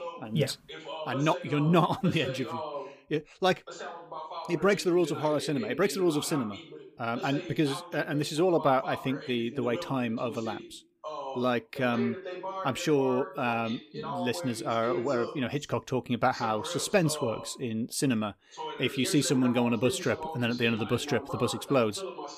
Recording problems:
voice in the background; noticeable; throughout; 10 dB below the speech

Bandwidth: 15 kHz